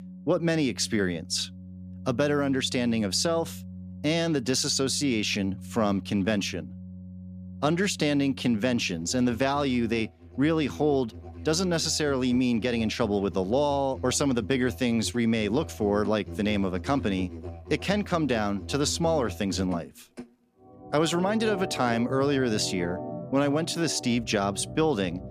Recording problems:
background music; noticeable; throughout; 15 dB below the speech

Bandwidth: 14.5 kHz